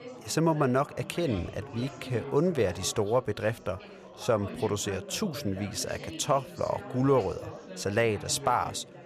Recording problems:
chatter from many people; noticeable; throughout; 15 dB below the speech

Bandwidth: 14.5 kHz